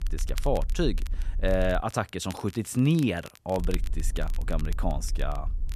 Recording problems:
crackle, like an old record; noticeable; 20 dB below the speech
low rumble; faint; until 2 s and from 3.5 s on; 25 dB below the speech

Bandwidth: 14 kHz